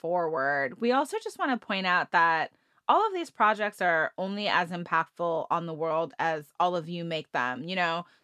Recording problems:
none

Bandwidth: 14 kHz